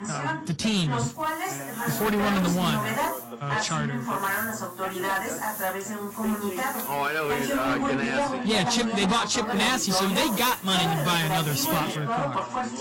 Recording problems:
distortion; heavy; 14% of the sound clipped
garbled, watery; slightly; nothing above 11.5 kHz
background chatter; loud; throughout; 3 voices, 3 dB below the speech
hiss; noticeable; from 1 to 3 s, from 4 to 7.5 s and from 9.5 to 12 s; 10 dB below the speech

